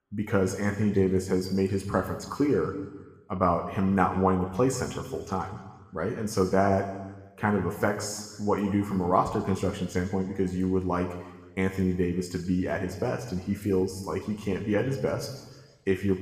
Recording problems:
room echo; slight; dies away in 1.2 s
off-mic speech; somewhat distant

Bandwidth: 15 kHz